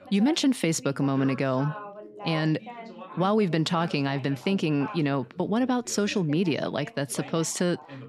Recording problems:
background chatter; noticeable; throughout; 2 voices, 15 dB below the speech

